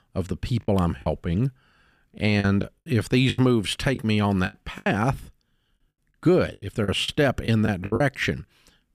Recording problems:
choppy; very; at 1 s, from 2.5 to 5 s and from 6.5 to 8 s; 12% of the speech affected

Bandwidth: 15 kHz